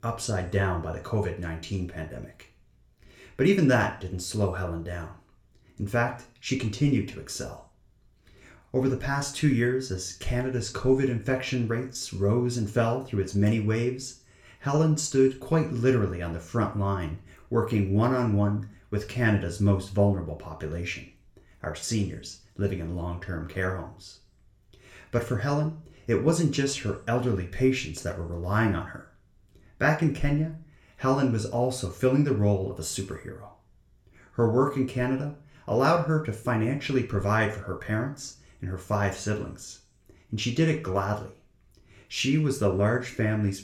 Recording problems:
room echo; very slight; dies away in 0.4 s
off-mic speech; somewhat distant

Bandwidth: 17.5 kHz